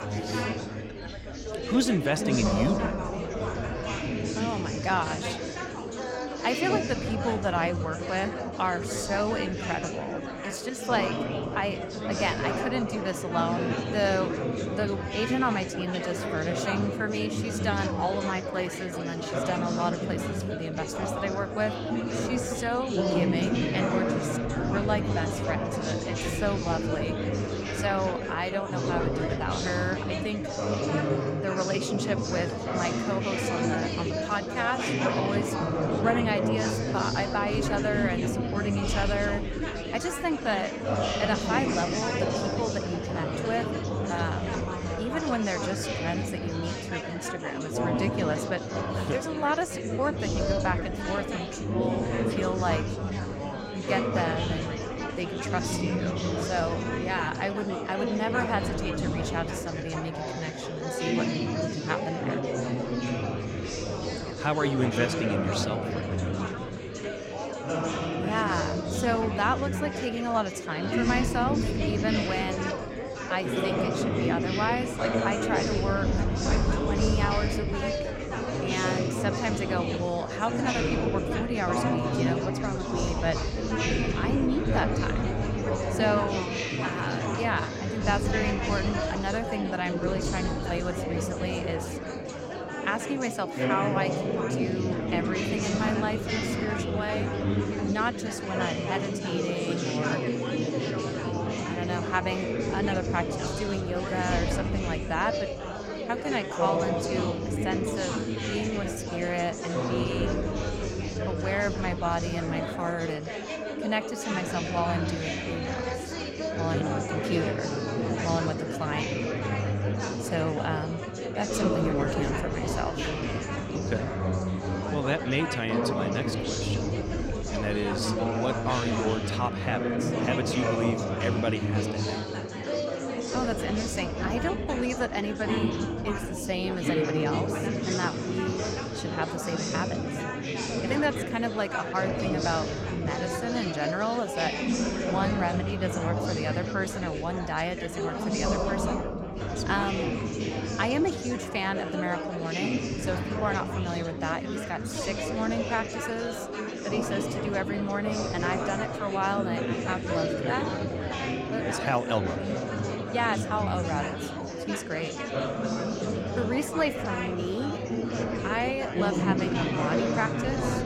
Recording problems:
chatter from many people; very loud; throughout; 1 dB above the speech

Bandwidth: 16.5 kHz